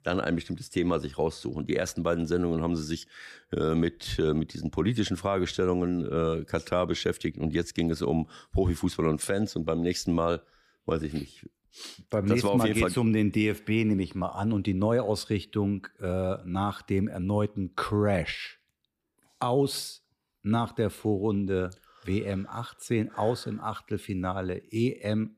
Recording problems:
none

